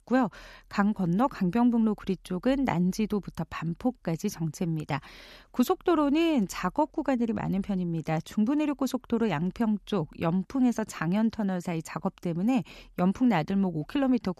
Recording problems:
none

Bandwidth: 13.5 kHz